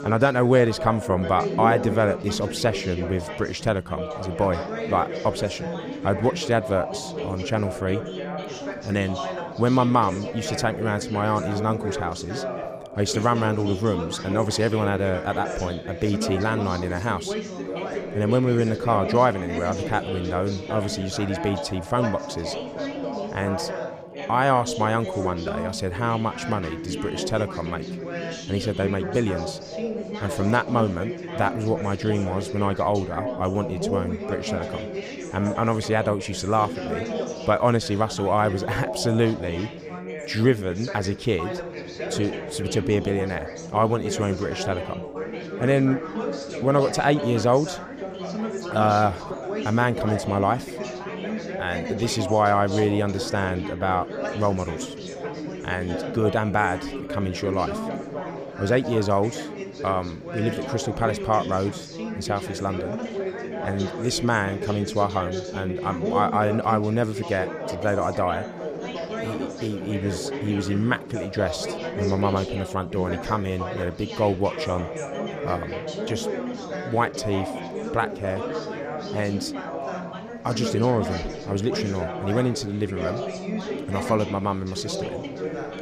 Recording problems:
background chatter; loud; throughout; 3 voices, 6 dB below the speech

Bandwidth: 15 kHz